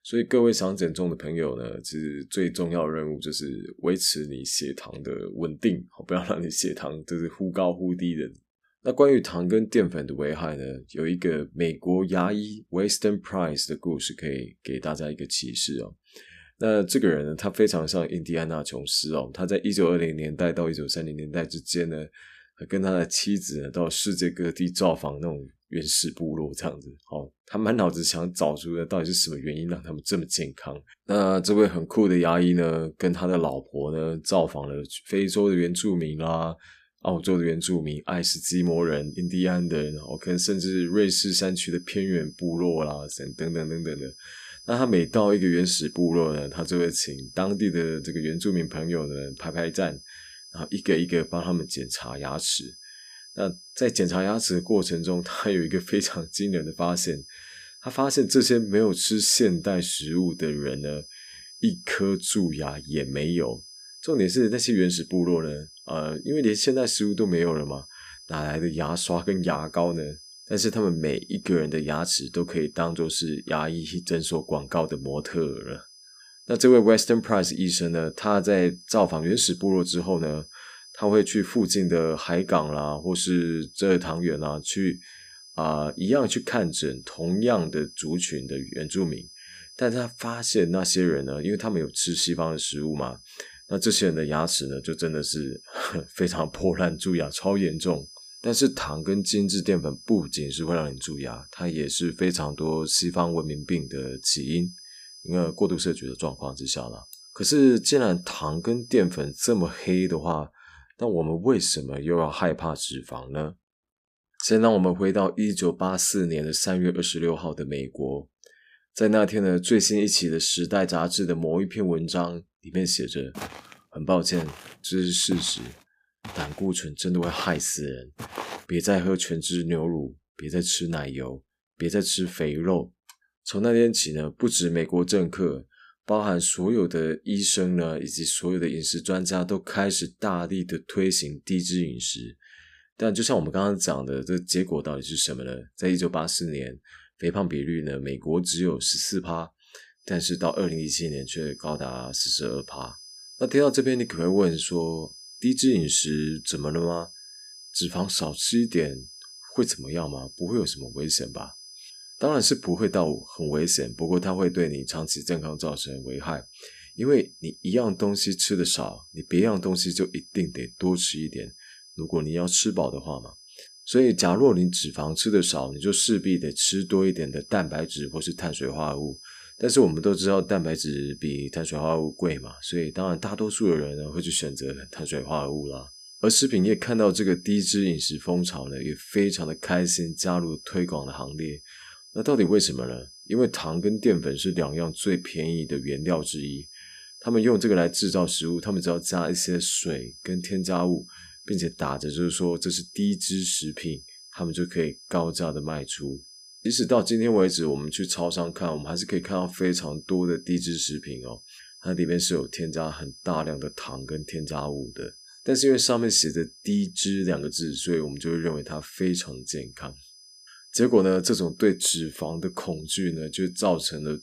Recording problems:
high-pitched whine; noticeable; from 38 s to 1:50 and from 2:30 on; 5 kHz, 20 dB below the speech
footsteps; noticeable; from 2:03 to 2:09; peak 10 dB below the speech

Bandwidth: 15 kHz